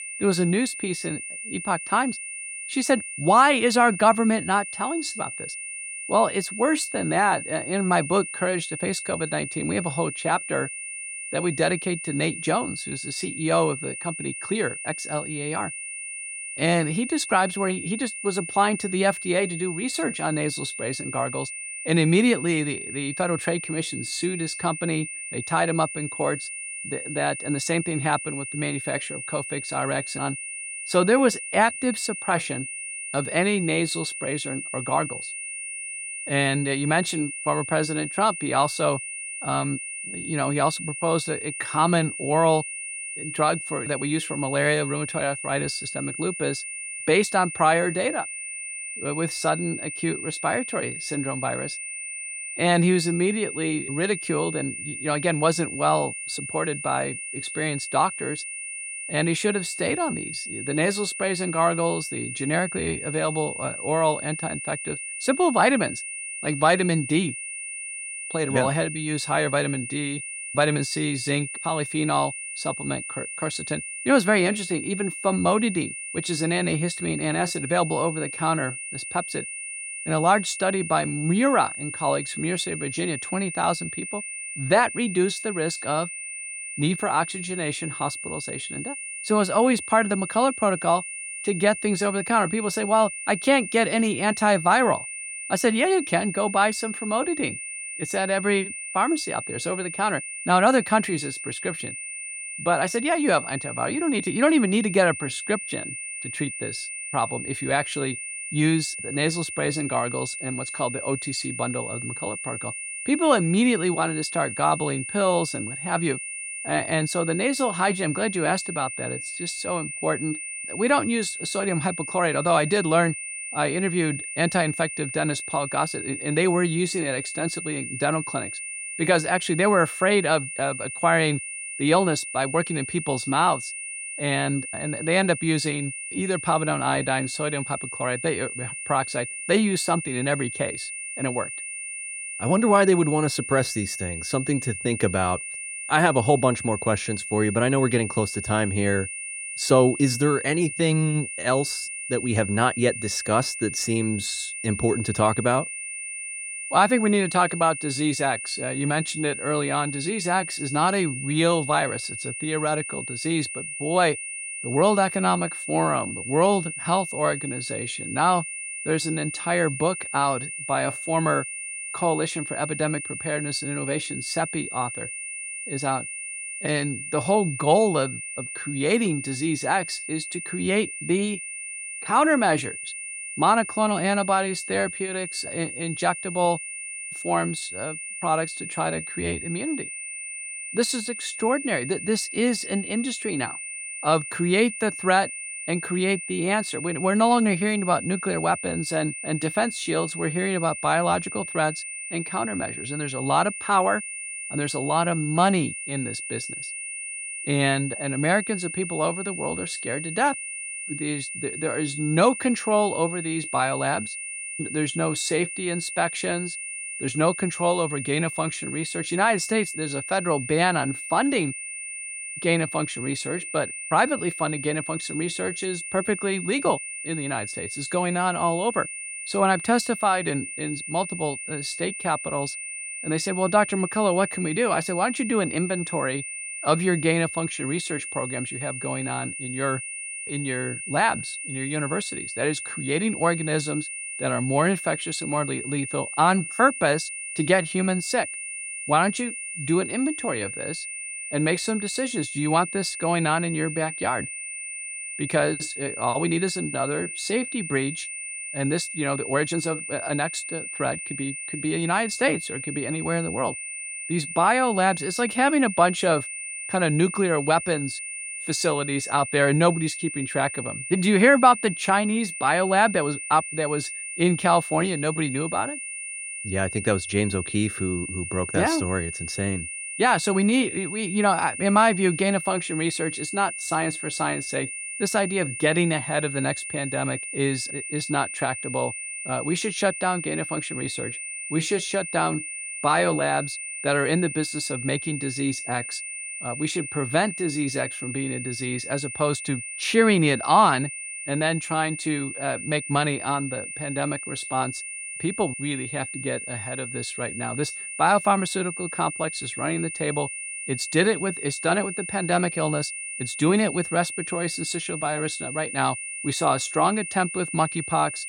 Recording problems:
high-pitched whine; loud; throughout; 2.5 kHz, 7 dB below the speech

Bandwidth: 16 kHz